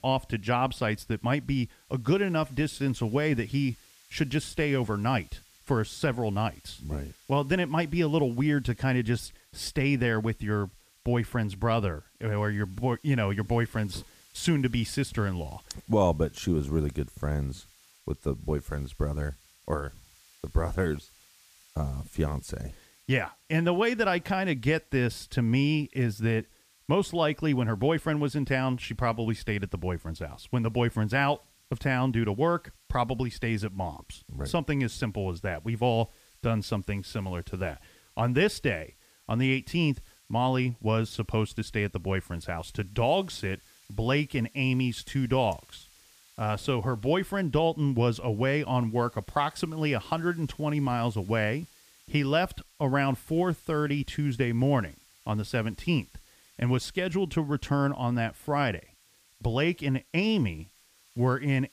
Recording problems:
hiss; faint; throughout; 30 dB below the speech

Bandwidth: 15 kHz